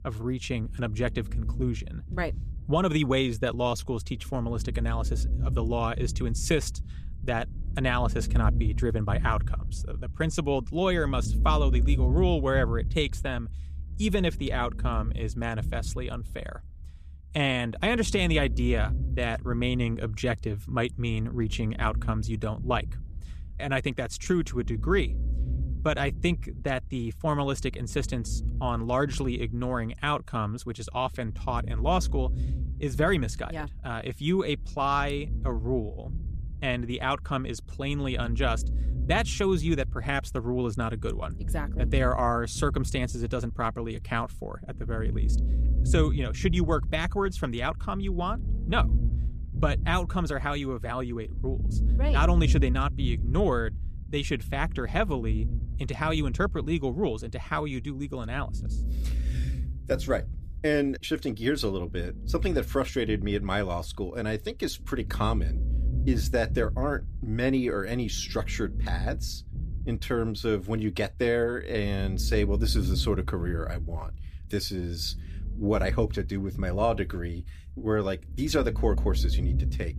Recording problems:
low rumble; noticeable; throughout; 20 dB below the speech

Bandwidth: 14.5 kHz